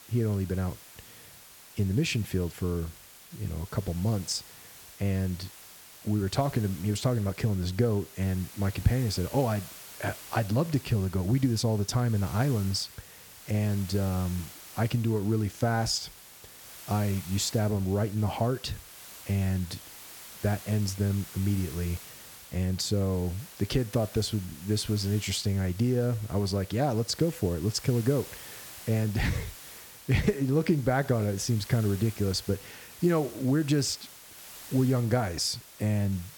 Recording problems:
hiss; noticeable; throughout; 15 dB below the speech

